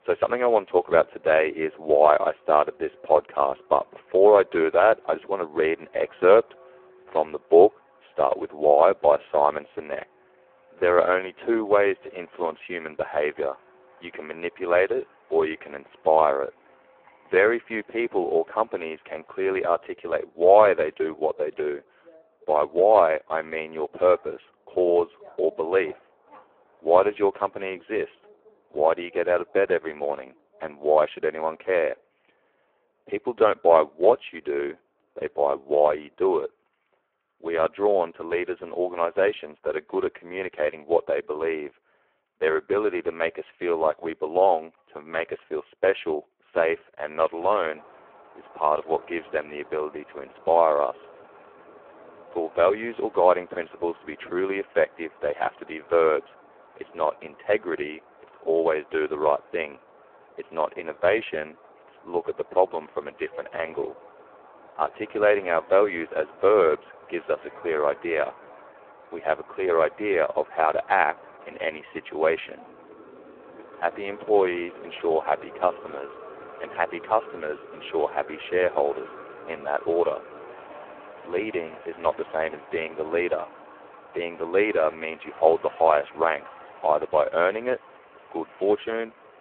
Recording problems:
phone-call audio; poor line
traffic noise; faint; throughout; 25 dB below the speech

